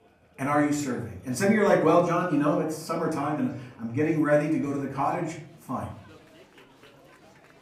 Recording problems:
off-mic speech; far
room echo; slight; dies away in 0.4 s
chatter from many people; faint; throughout; 30 dB below the speech

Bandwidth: 15.5 kHz